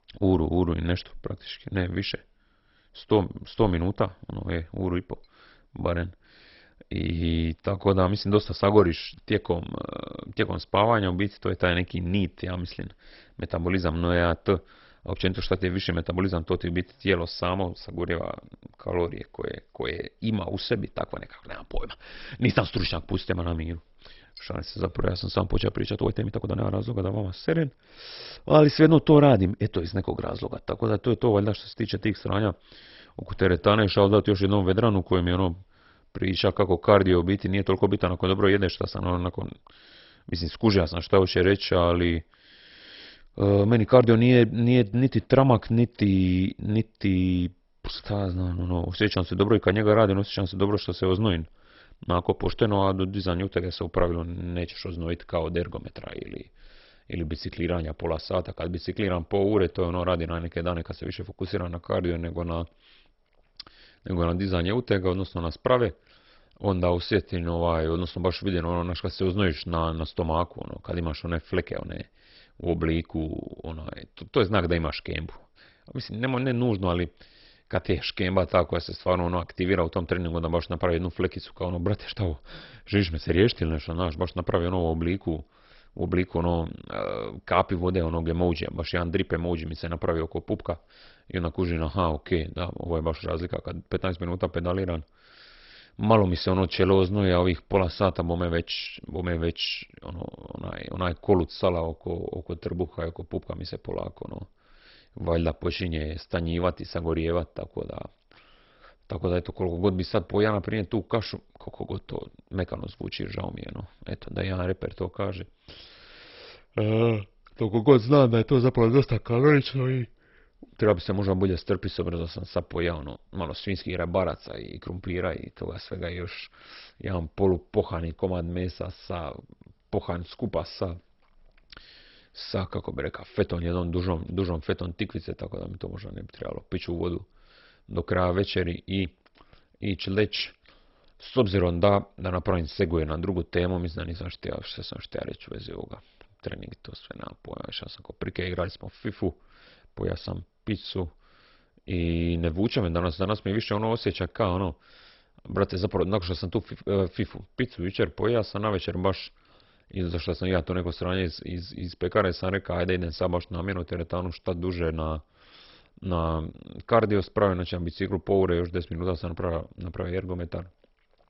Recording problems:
garbled, watery; badly; nothing above 5.5 kHz
uneven, jittery; strongly; from 7 s to 2:47

